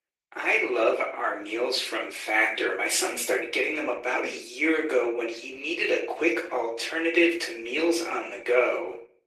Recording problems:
off-mic speech; far
thin; very; fading below 350 Hz
room echo; slight; dies away in 0.4 s
garbled, watery; slightly; nothing above 14.5 kHz

